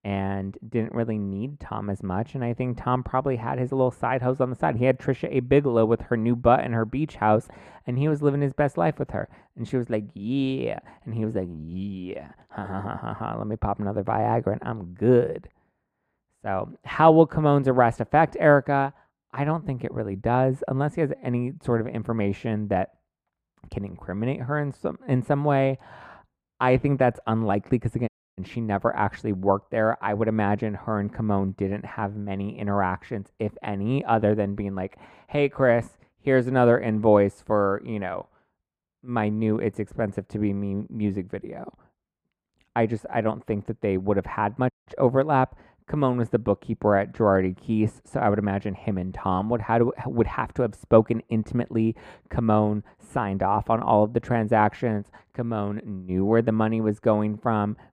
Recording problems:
muffled; very; fading above 2 kHz
audio cutting out; at 28 s and at 45 s

